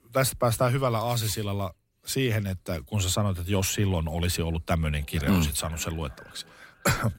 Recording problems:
echo of what is said; faint; from 5 s on; 470 ms later, 25 dB below the speech

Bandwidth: 16 kHz